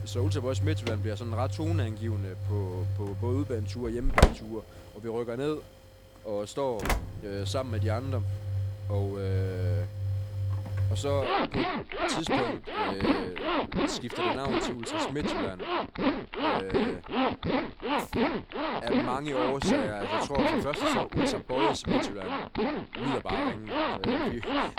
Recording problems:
household noises; very loud; throughout; 5 dB above the speech

